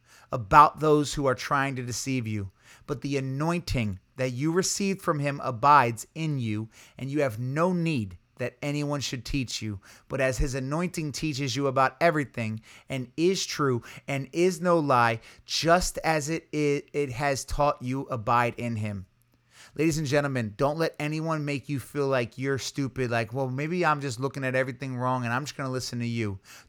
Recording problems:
none

